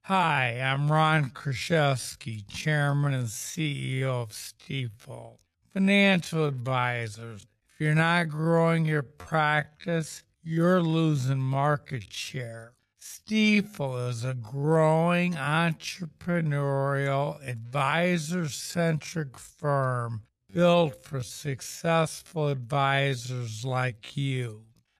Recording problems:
wrong speed, natural pitch; too slow; 0.5 times normal speed

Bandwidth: 14.5 kHz